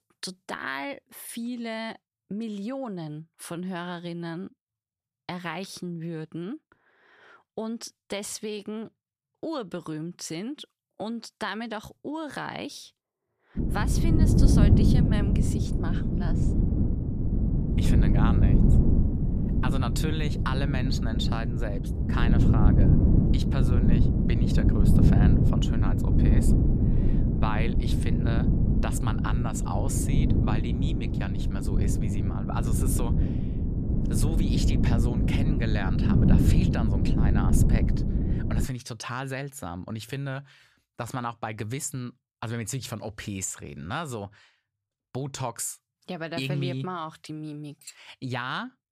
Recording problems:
wind noise on the microphone; heavy; from 14 to 39 s; 1 dB above the speech

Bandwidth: 14.5 kHz